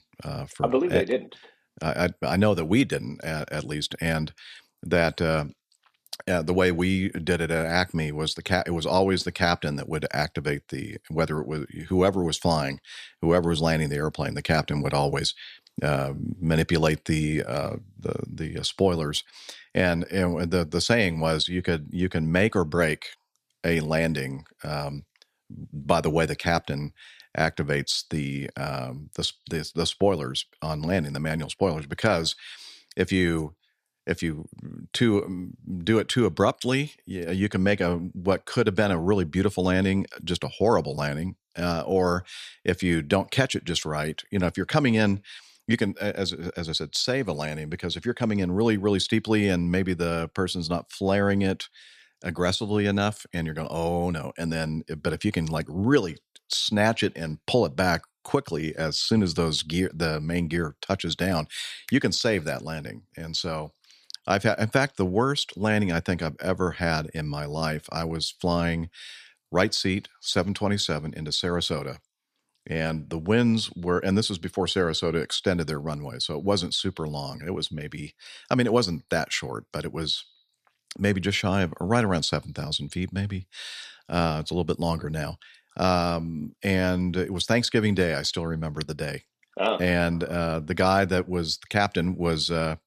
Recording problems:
none

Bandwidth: 14 kHz